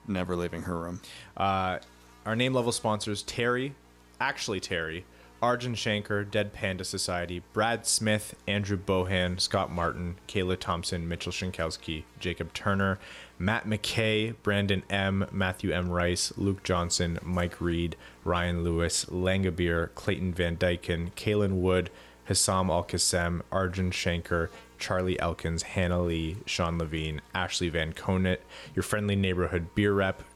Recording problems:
electrical hum; faint; throughout; 60 Hz, 25 dB below the speech

